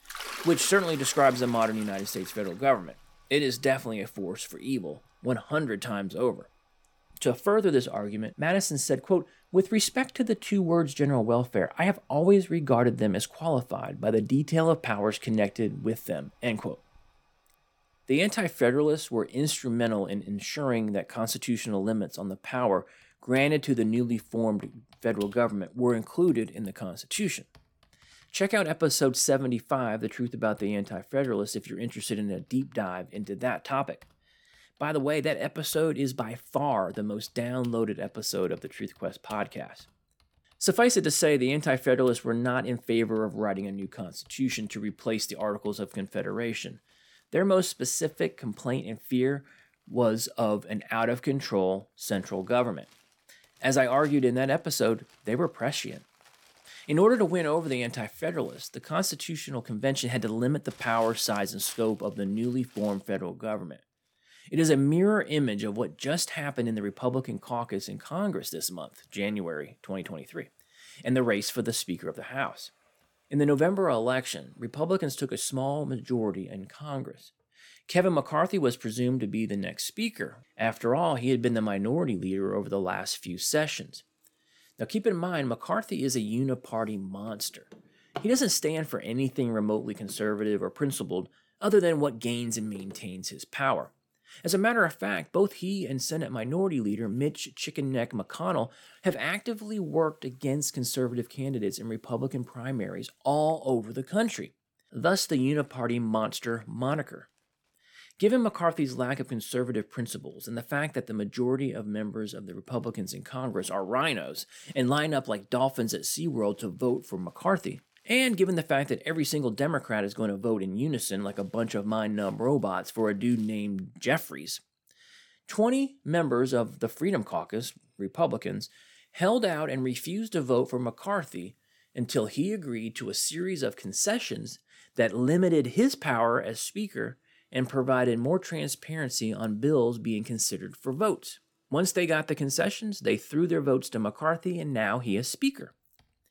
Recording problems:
household noises; faint; throughout; 20 dB below the speech

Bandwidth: 18 kHz